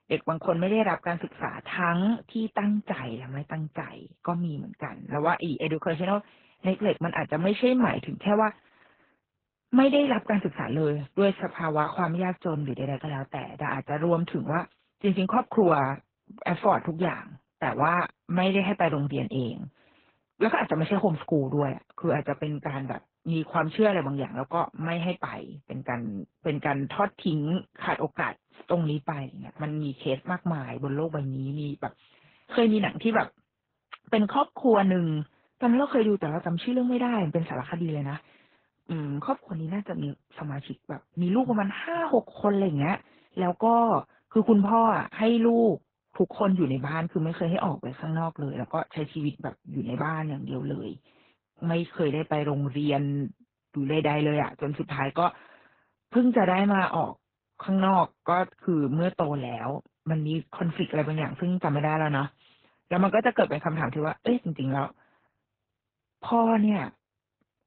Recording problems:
garbled, watery; badly; nothing above 3.5 kHz

